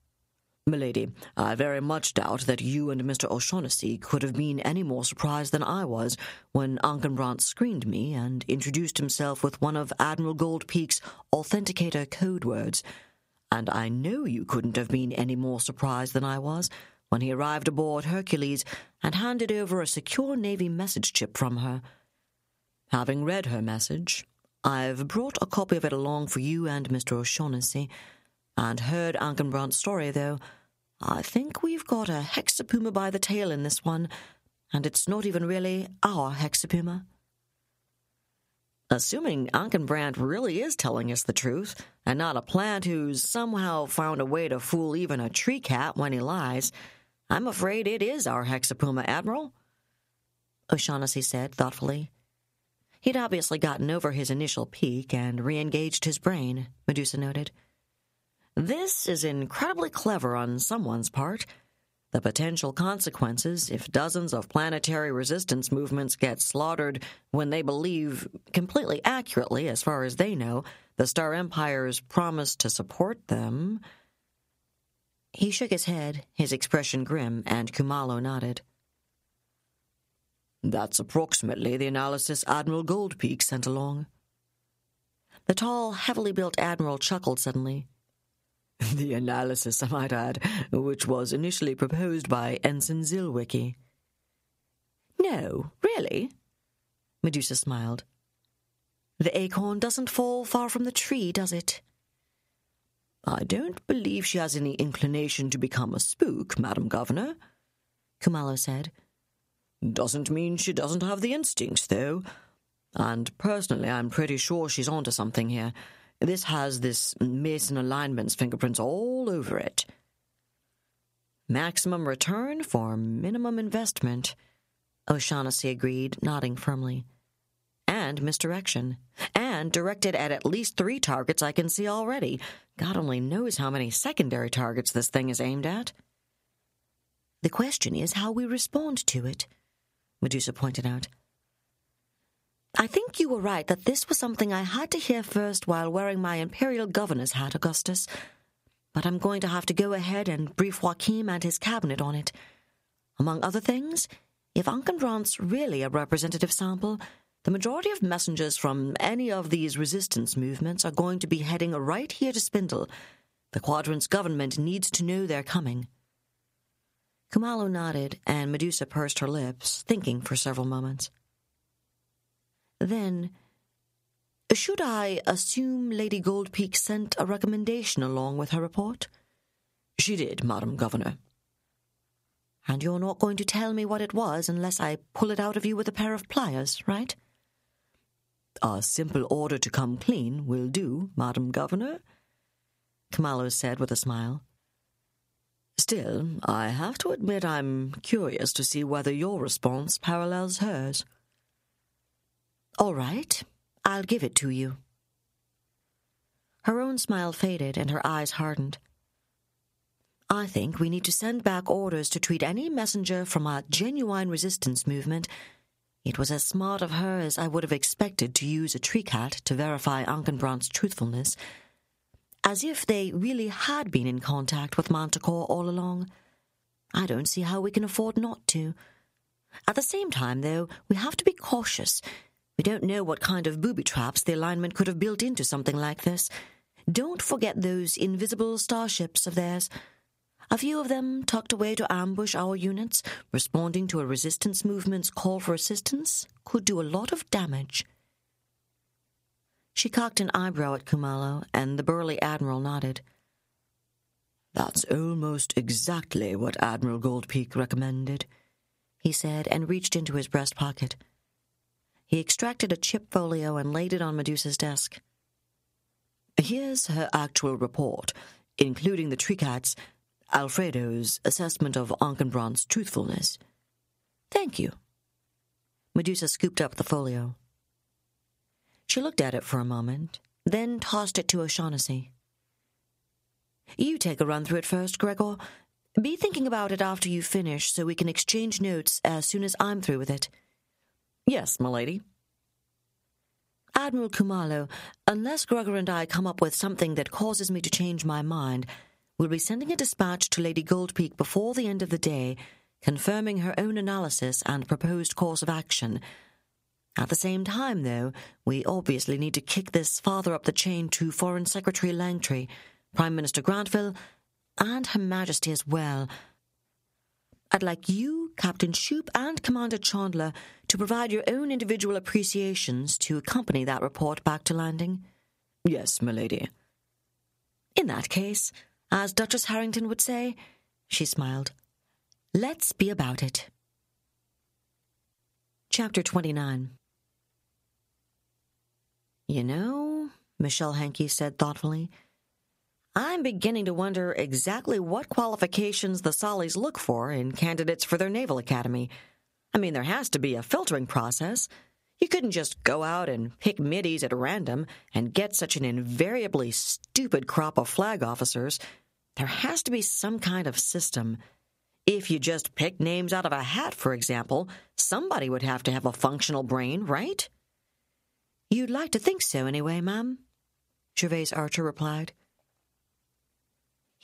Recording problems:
squashed, flat; somewhat

